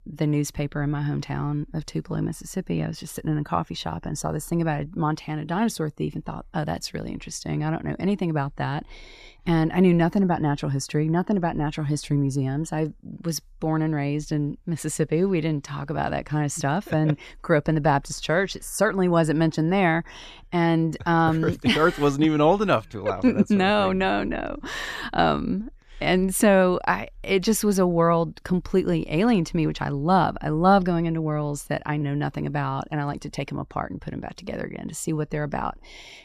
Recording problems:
none

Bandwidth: 14.5 kHz